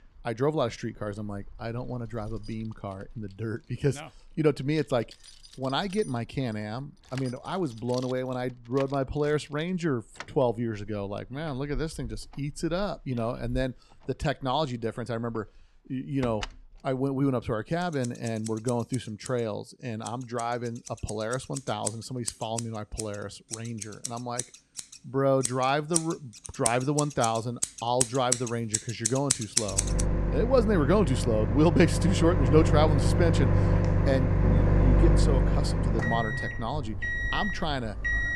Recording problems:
household noises; very loud; throughout; 1 dB above the speech

